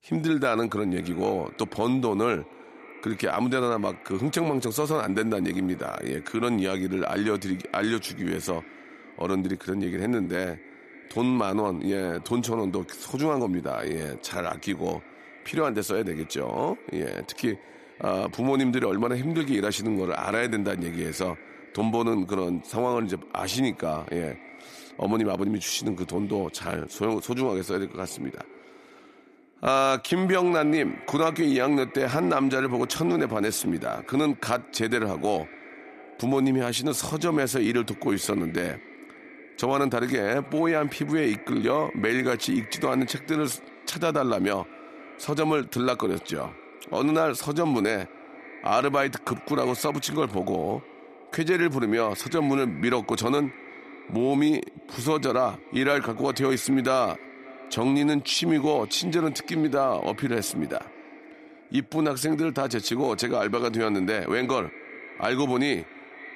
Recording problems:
echo of what is said; faint; throughout; 250 ms later, 20 dB below the speech

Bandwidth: 14 kHz